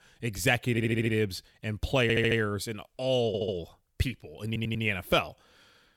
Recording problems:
audio stuttering; 4 times, first at 0.5 s

